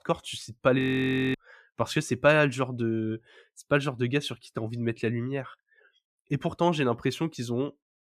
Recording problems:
audio freezing; at 1 s for 0.5 s

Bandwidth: 14.5 kHz